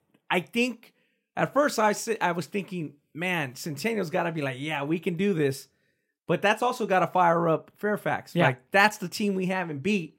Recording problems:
none

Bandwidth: 16 kHz